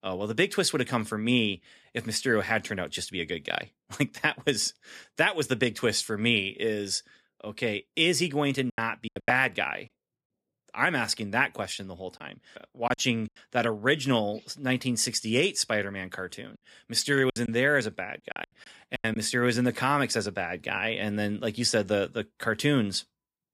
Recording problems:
choppy; very; at 8.5 s, at 12 s and from 17 to 19 s; 13% of the speech affected

